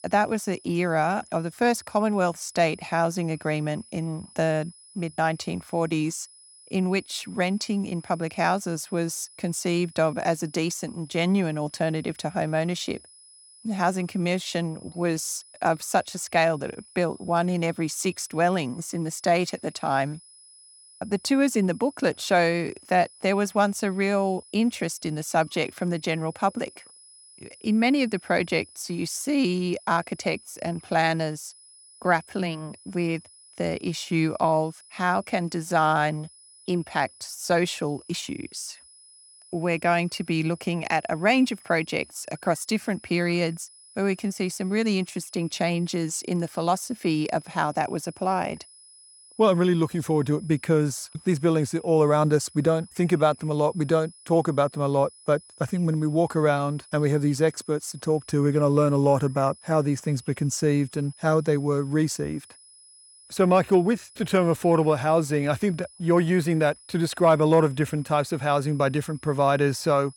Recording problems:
high-pitched whine; faint; throughout; 10 kHz, 25 dB below the speech

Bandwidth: 18.5 kHz